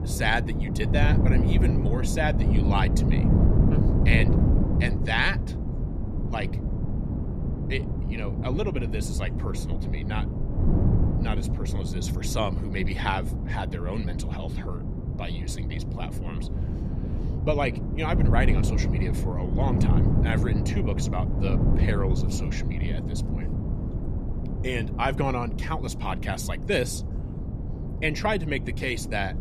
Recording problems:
wind noise on the microphone; heavy; 6 dB below the speech

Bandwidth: 13.5 kHz